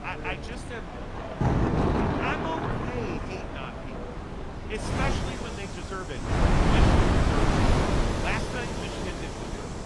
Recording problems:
garbled, watery; slightly; nothing above 10.5 kHz
rain or running water; very loud; throughout; 5 dB above the speech
wind noise on the microphone; heavy; 2 dB above the speech
background chatter; loud; throughout; 2 voices, 9 dB below the speech

